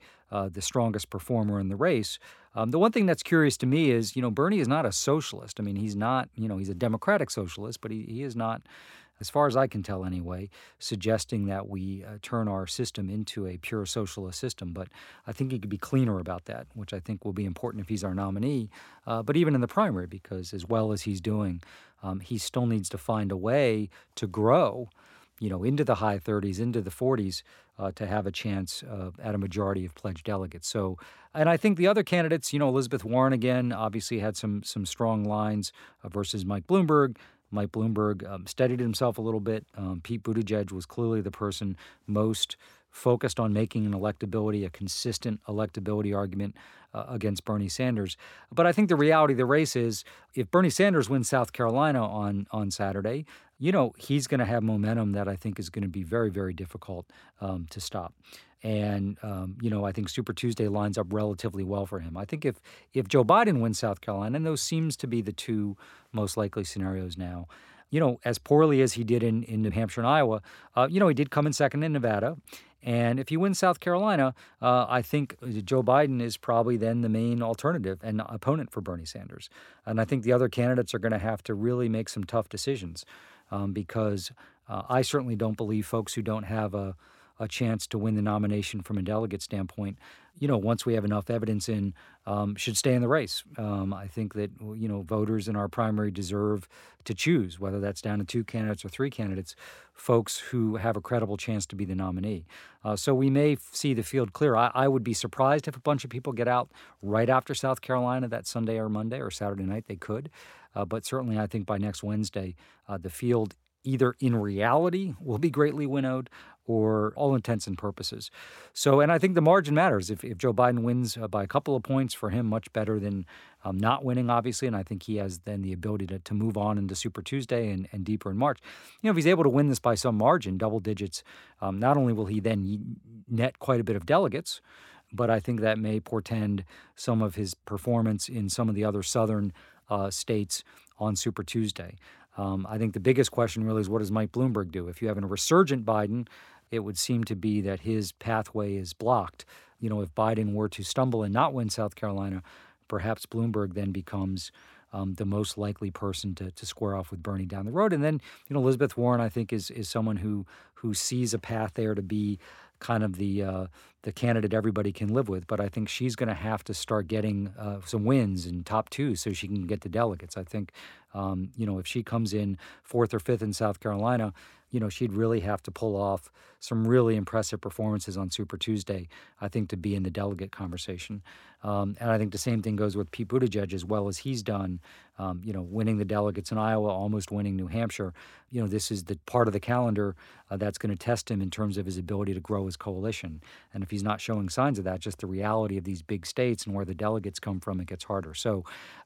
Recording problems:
none

